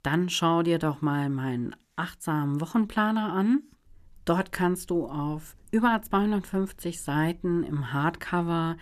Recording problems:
none

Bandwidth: 14.5 kHz